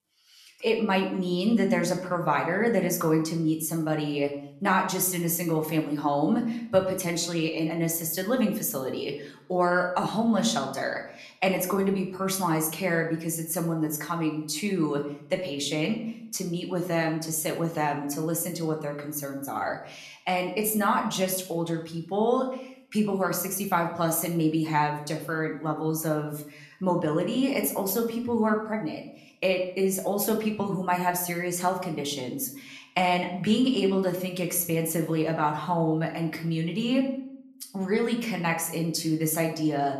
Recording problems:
room echo; slight; dies away in 0.5 s
off-mic speech; somewhat distant

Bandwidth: 13.5 kHz